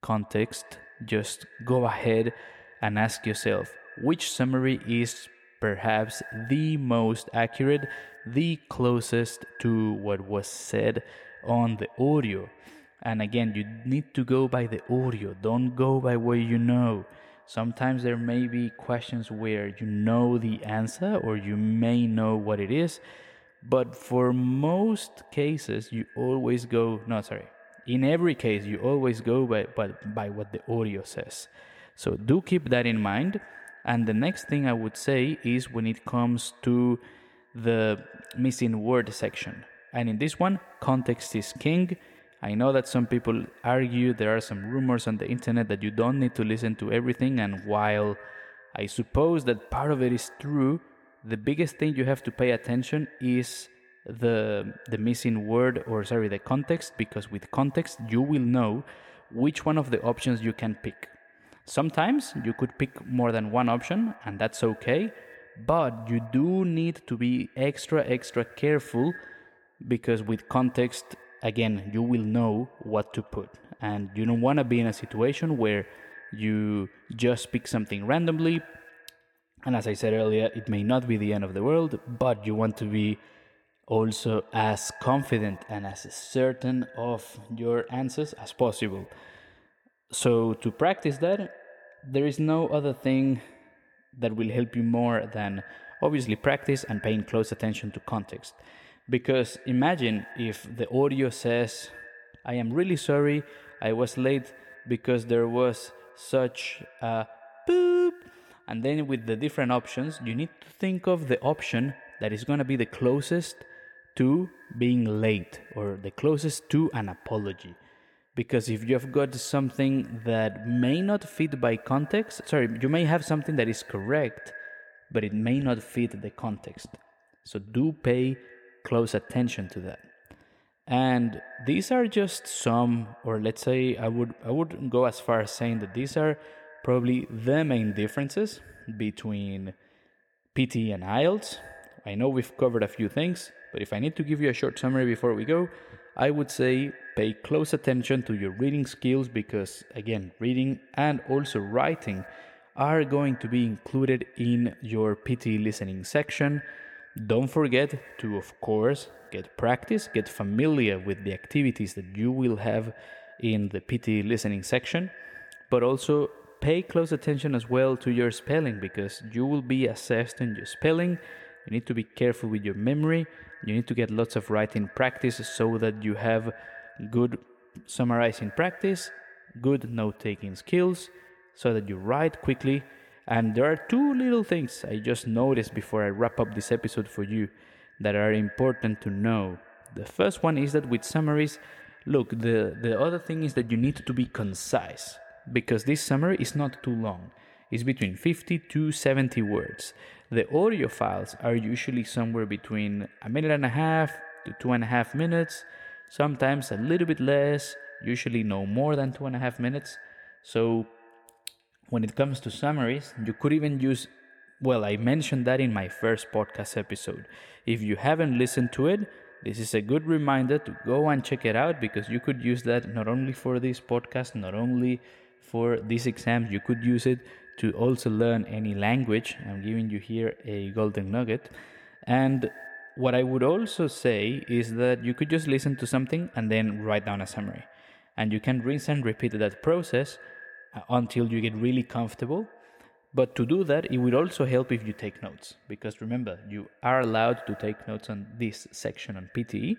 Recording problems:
echo of what is said; faint; throughout; 130 ms later, 20 dB below the speech

